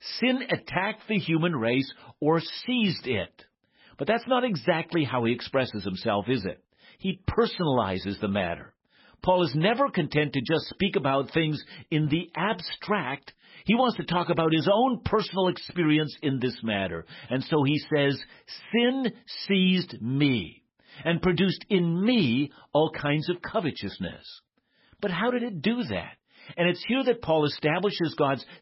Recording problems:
garbled, watery; badly; nothing above 5.5 kHz

